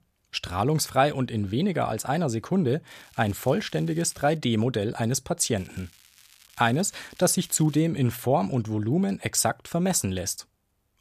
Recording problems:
crackling; faint; from 3 to 4.5 s and from 5.5 to 8 s; 25 dB below the speech

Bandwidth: 14.5 kHz